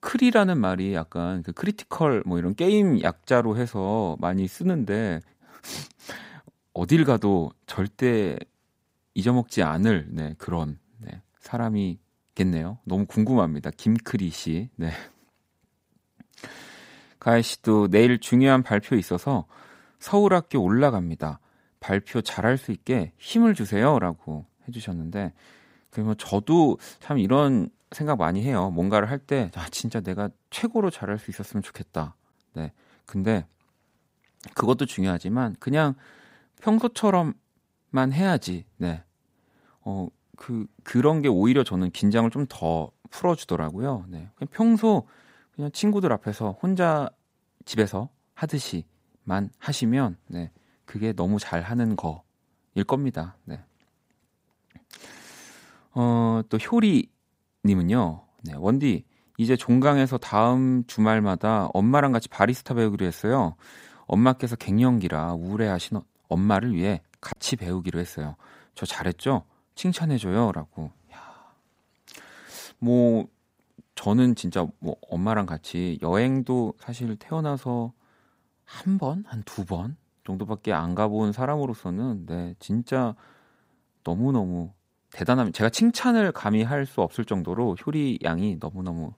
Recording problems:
choppy; occasionally; at 1:07; 2% of the speech affected

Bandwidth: 15.5 kHz